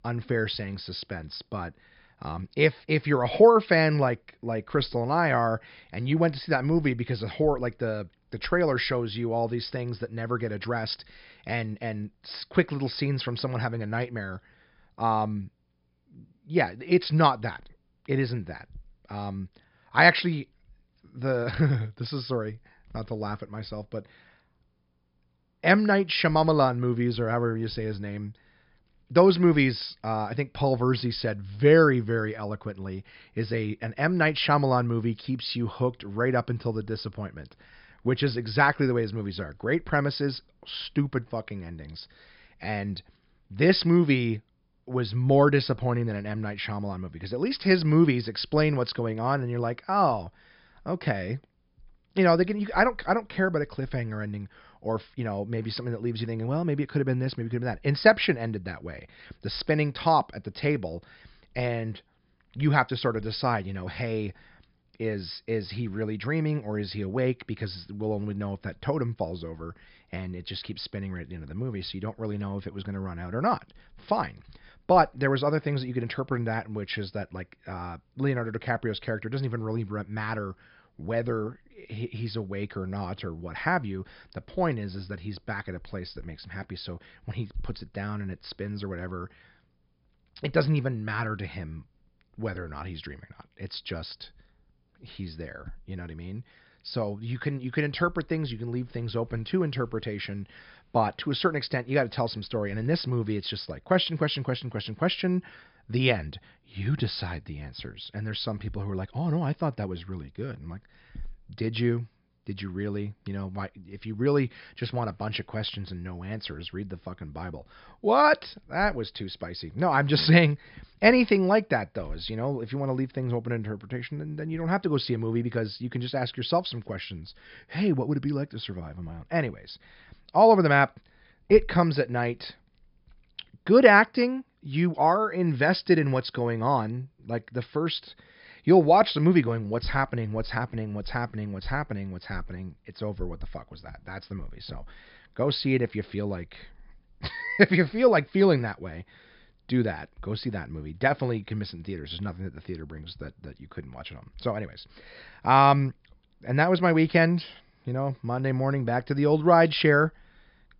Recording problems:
high frequencies cut off; noticeable; nothing above 5.5 kHz

